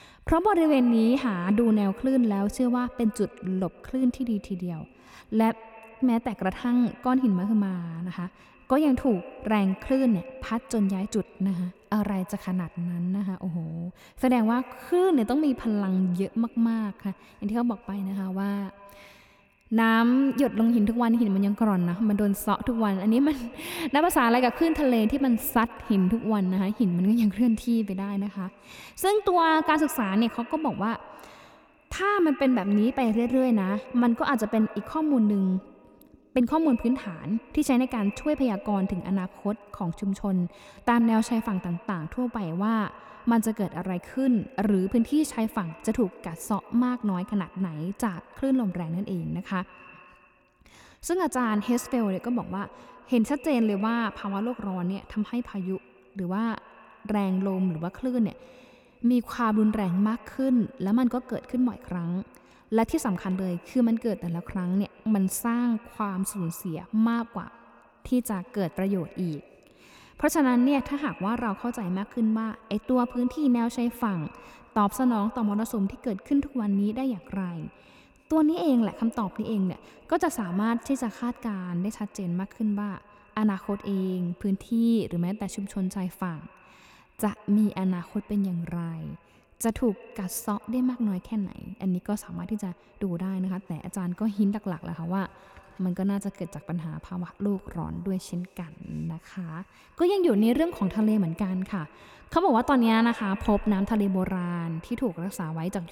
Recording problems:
echo of what is said; faint; throughout; 130 ms later, 20 dB below the speech

